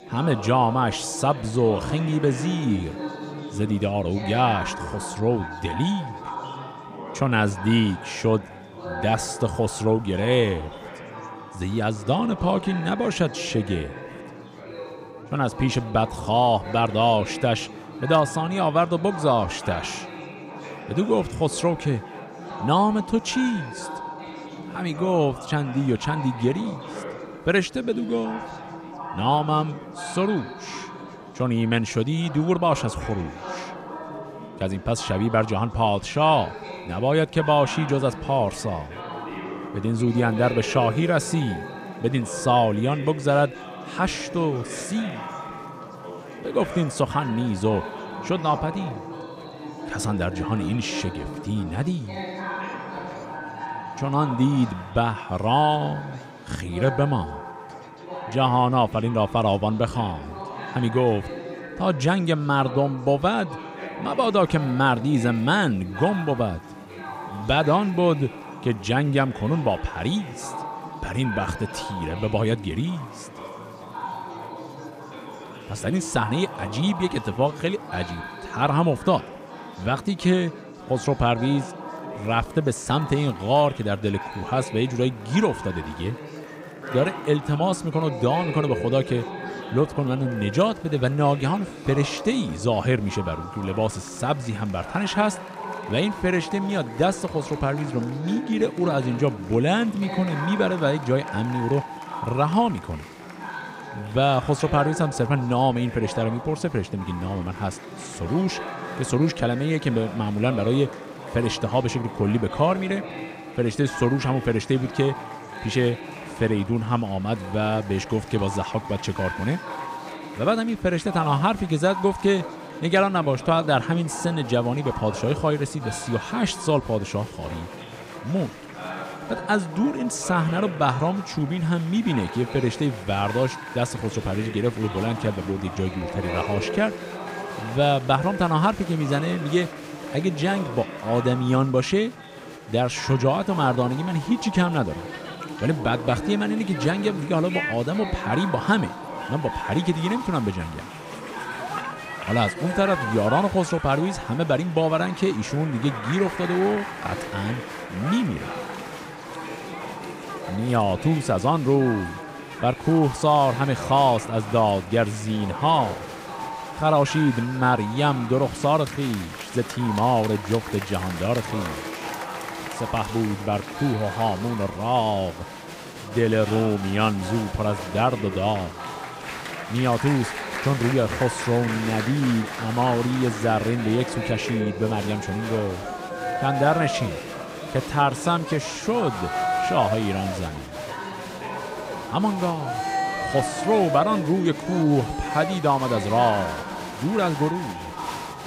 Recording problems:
murmuring crowd; loud; throughout; 10 dB below the speech

